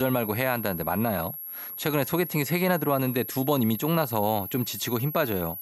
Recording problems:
high-pitched whine; loud; throughout; 11.5 kHz, 8 dB below the speech
abrupt cut into speech; at the start

